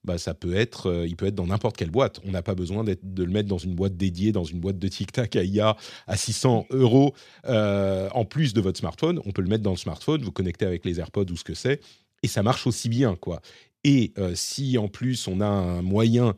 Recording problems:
none

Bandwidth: 14.5 kHz